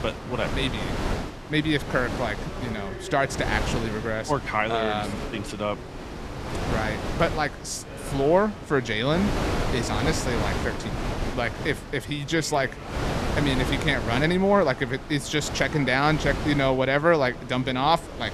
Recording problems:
wind noise on the microphone; heavy; 9 dB below the speech
background chatter; noticeable; throughout; 3 voices, 20 dB below the speech

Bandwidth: 13.5 kHz